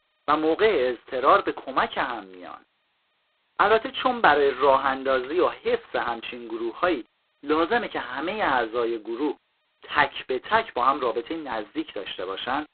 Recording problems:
phone-call audio; poor line; nothing above 4 kHz

